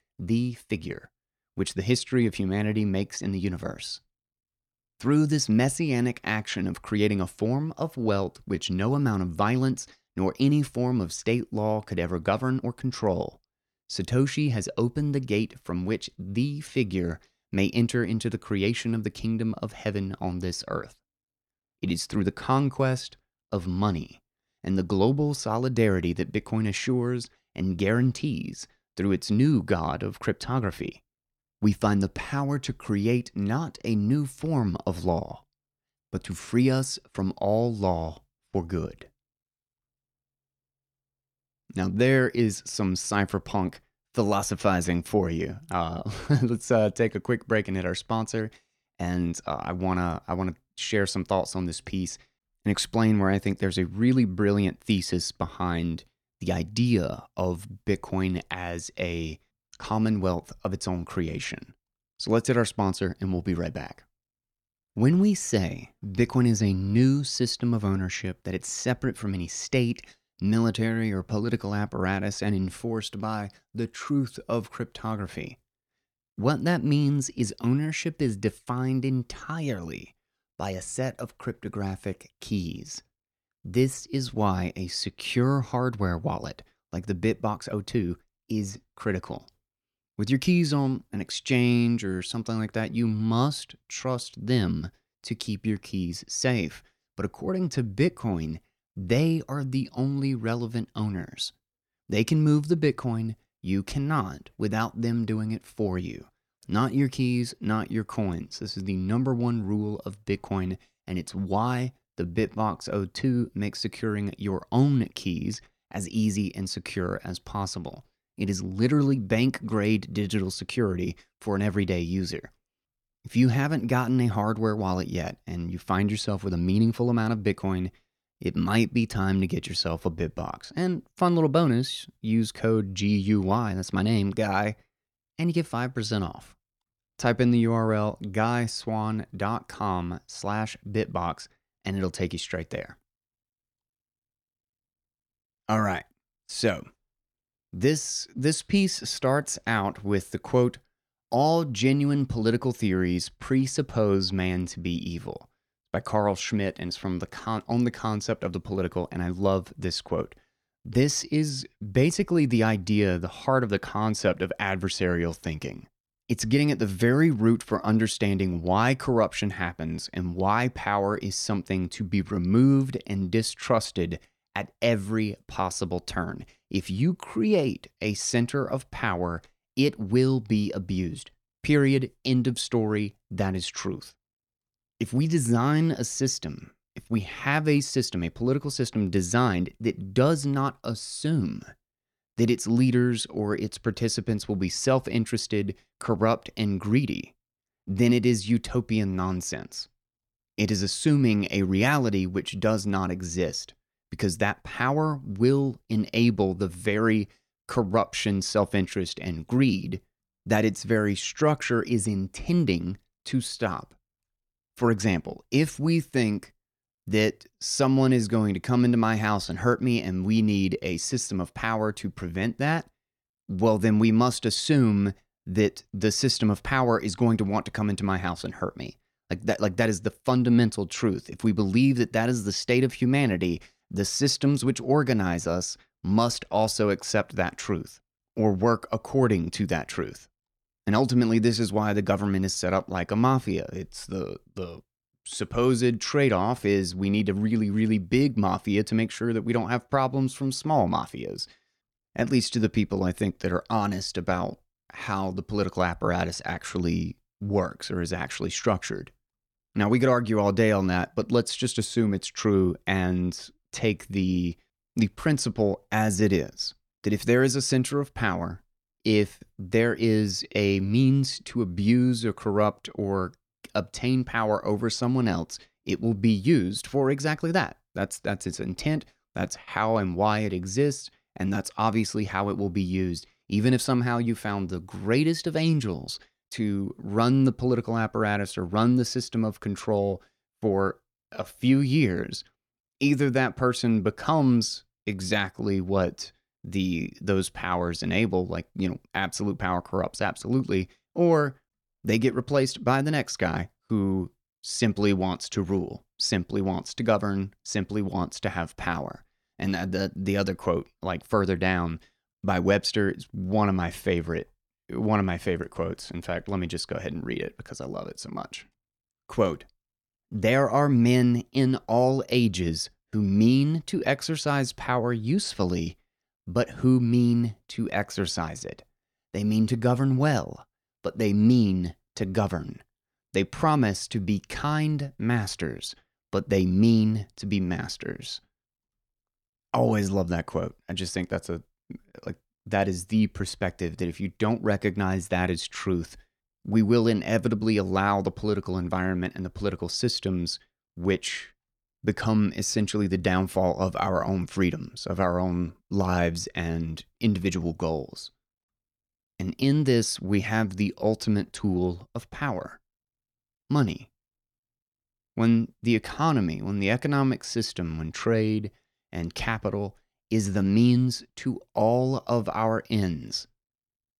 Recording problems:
uneven, jittery; strongly; from 8 s to 4:52

